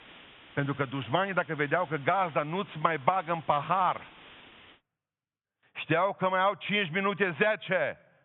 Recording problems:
high frequencies cut off; severe; nothing above 3.5 kHz
hiss; faint; until 5 s; 25 dB below the speech

